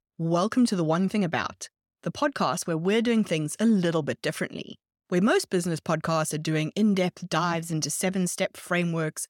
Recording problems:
none

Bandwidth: 17 kHz